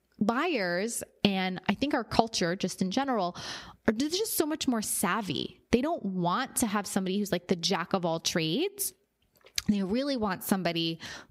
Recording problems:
squashed, flat; somewhat

